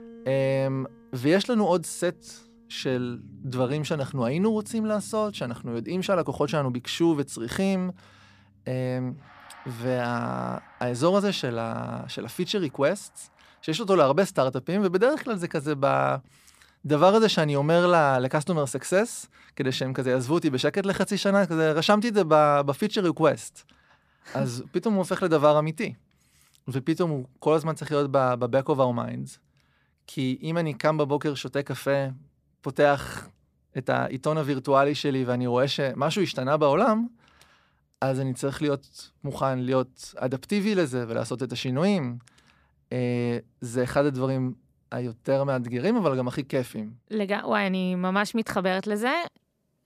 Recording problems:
background music; faint; until 14 s; 25 dB below the speech

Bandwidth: 14.5 kHz